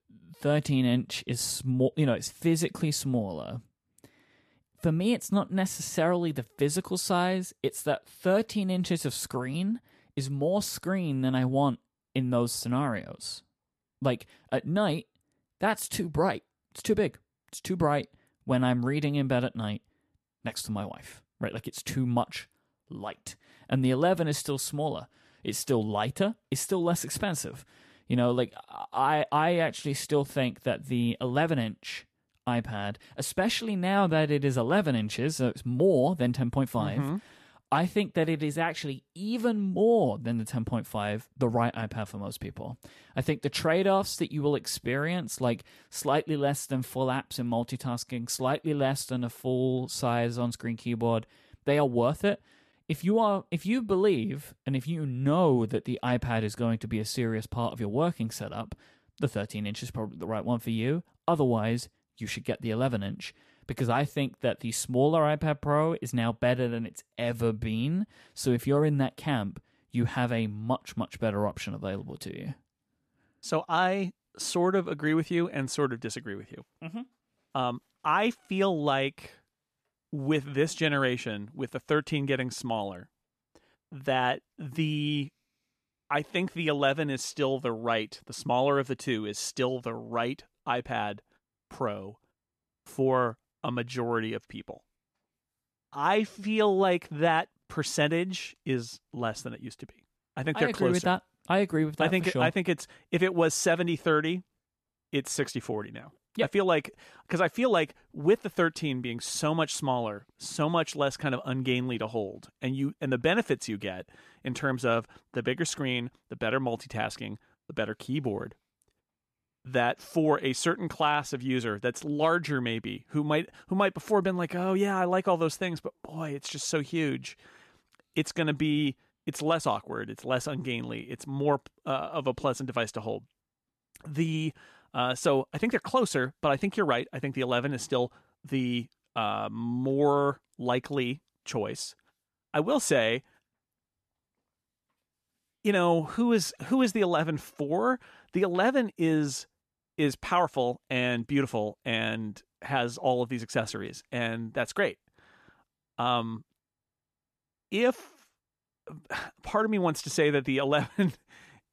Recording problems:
none

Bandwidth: 14 kHz